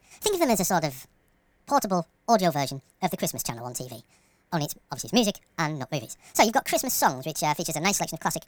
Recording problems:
wrong speed and pitch; too fast and too high; 1.5 times normal speed

